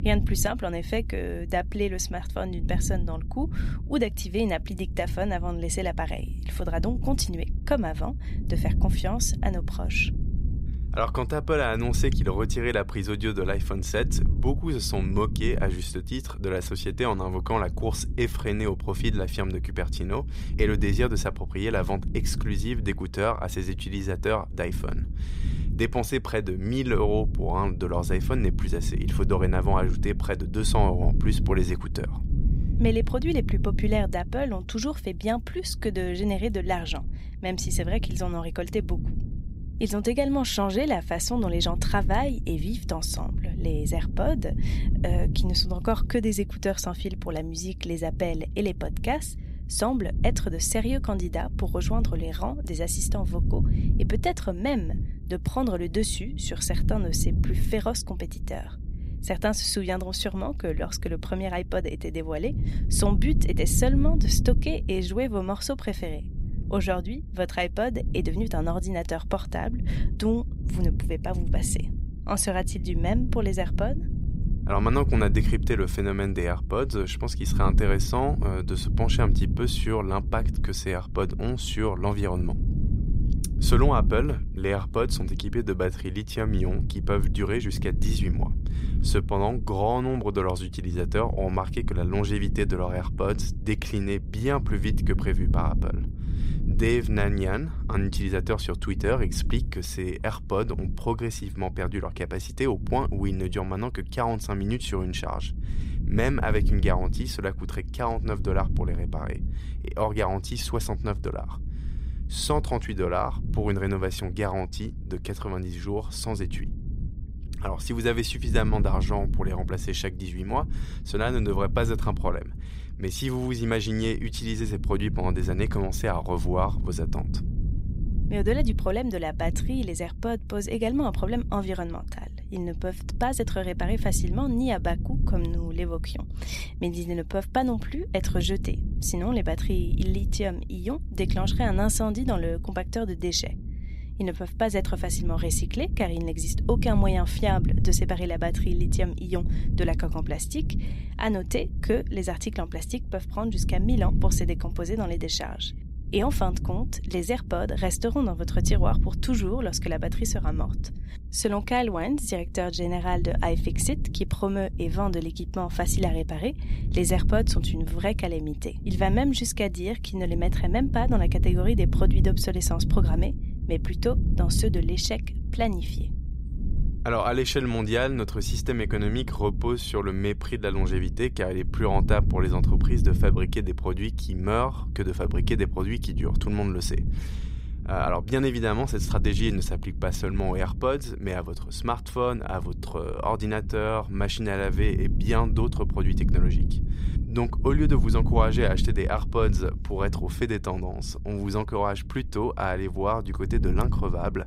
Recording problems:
low rumble; noticeable; throughout; 15 dB below the speech

